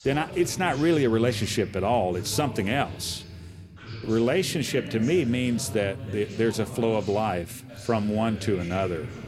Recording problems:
voice in the background; noticeable; throughout; 10 dB below the speech

